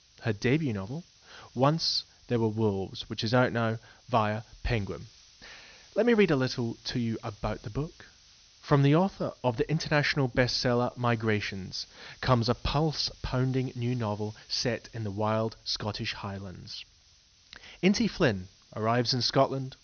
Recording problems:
high frequencies cut off; noticeable; nothing above 6.5 kHz
hiss; faint; throughout; 25 dB below the speech

